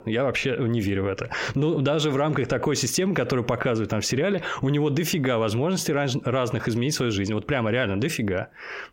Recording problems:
squashed, flat; heavily

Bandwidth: 16 kHz